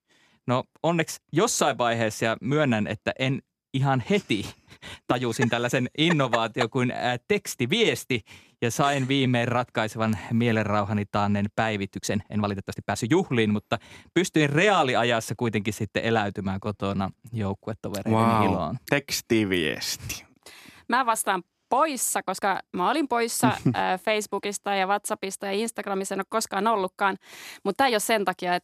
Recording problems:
uneven, jittery; strongly; from 4.5 to 22 s

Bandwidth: 14.5 kHz